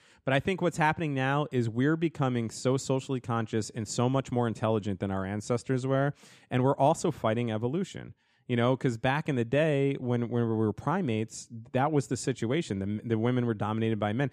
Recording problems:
none

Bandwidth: 14.5 kHz